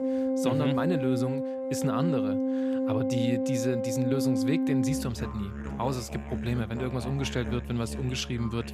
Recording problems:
background music; very loud; throughout; 1 dB above the speech

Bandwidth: 14.5 kHz